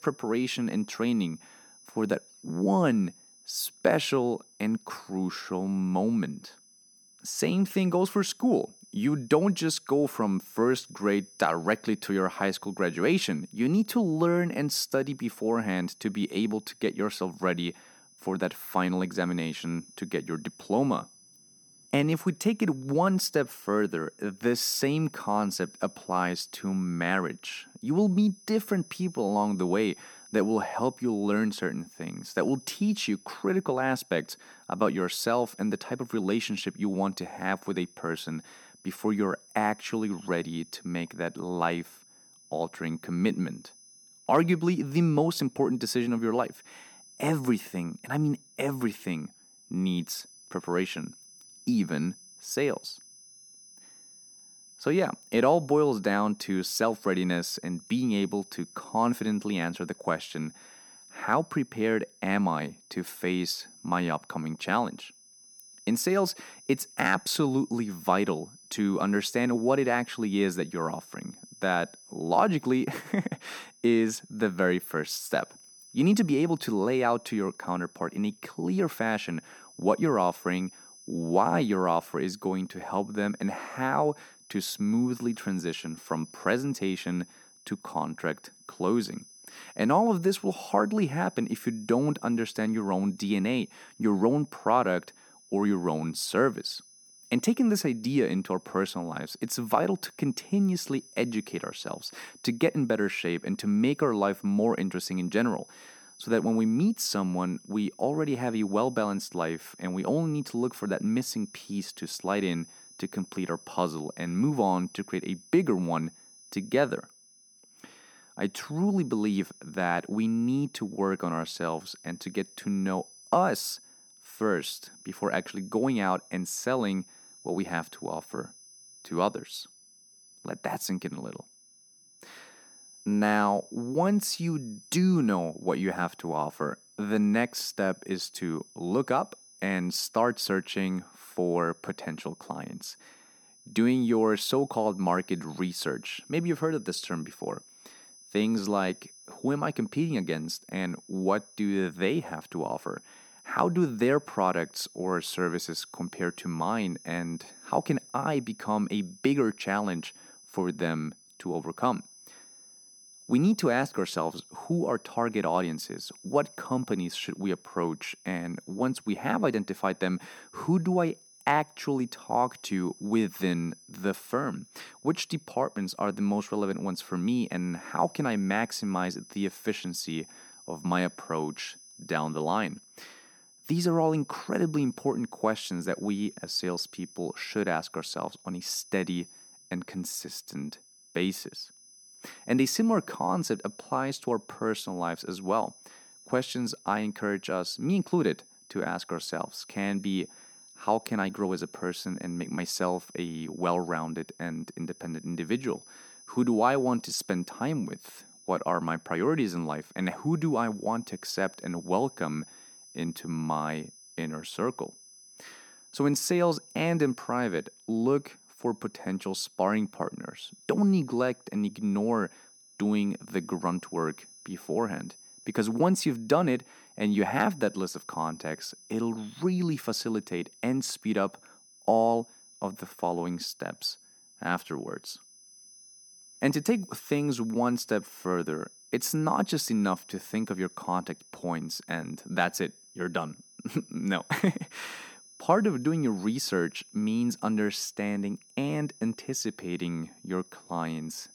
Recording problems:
high-pitched whine; faint; throughout; 6 kHz, 20 dB below the speech

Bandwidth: 18.5 kHz